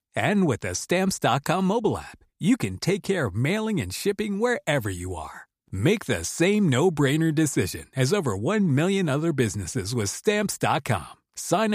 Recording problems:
abrupt cut into speech; at the end

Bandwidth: 15 kHz